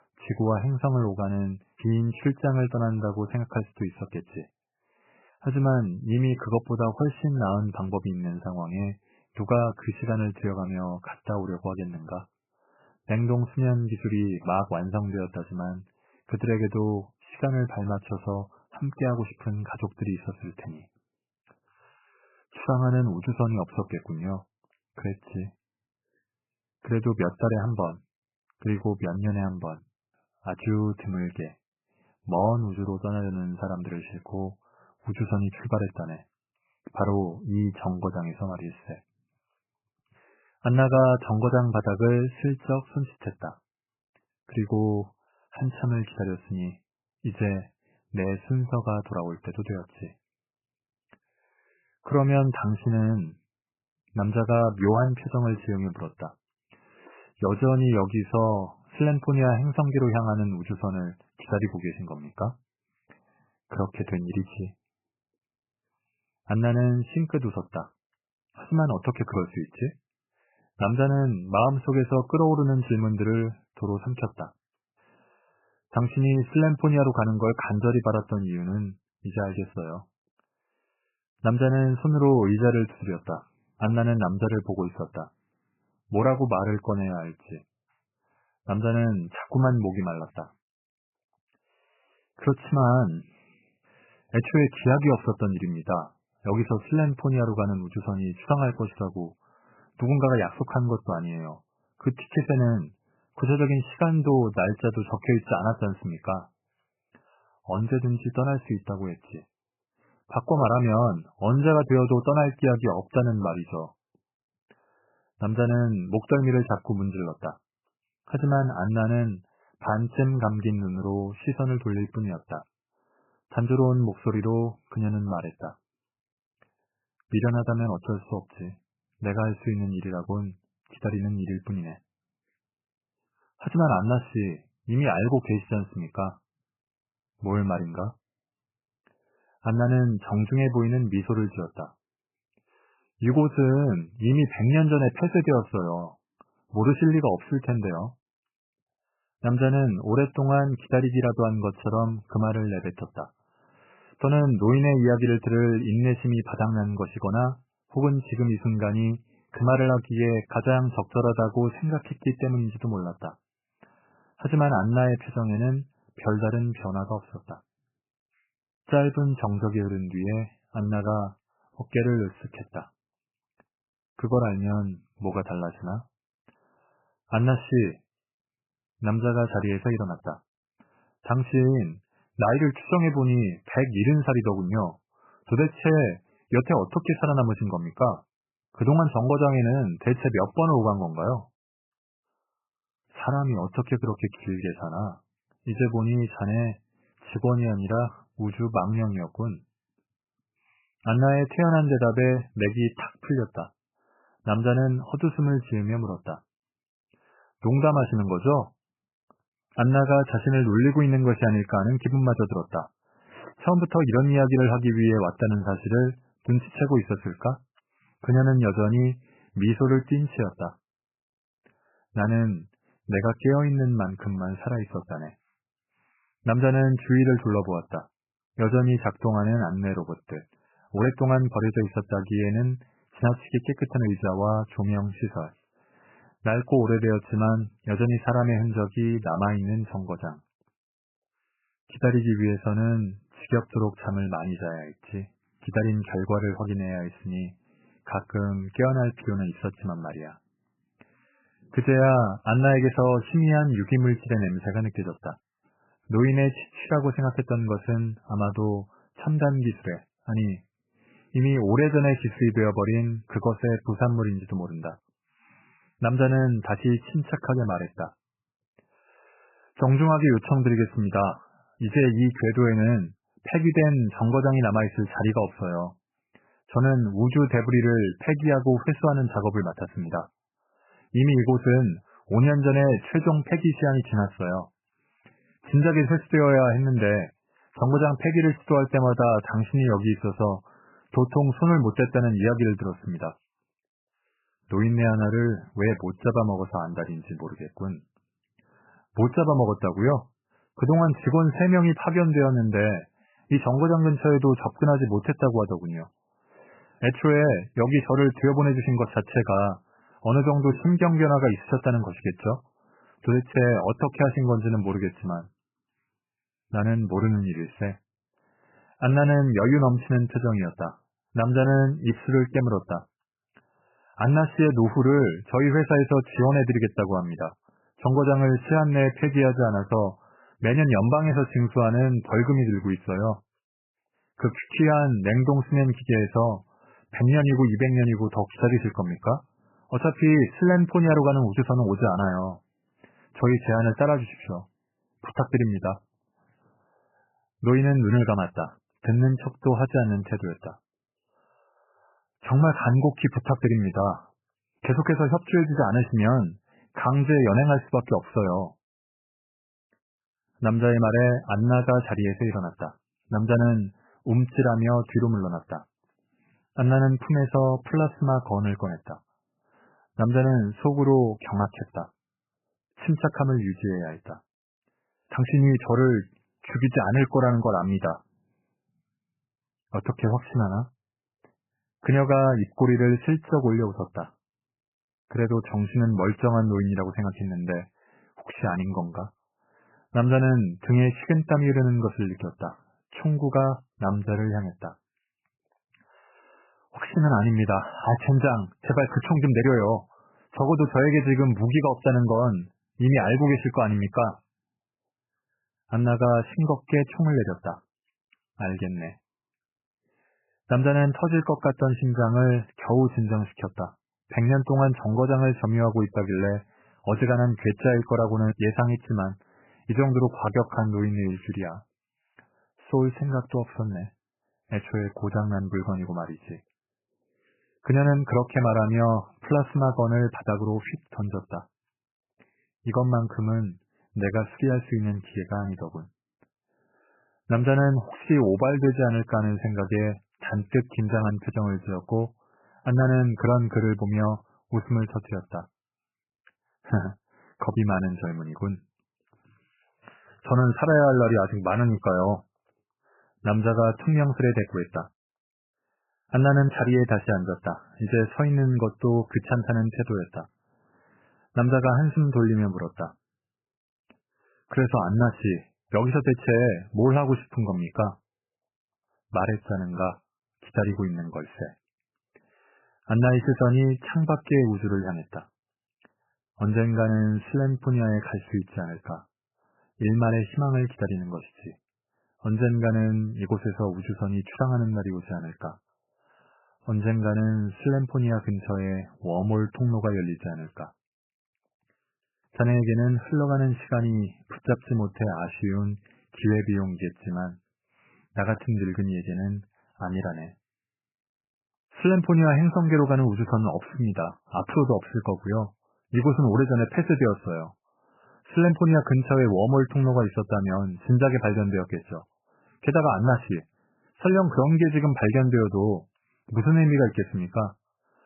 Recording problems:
garbled, watery; badly; nothing above 3 kHz

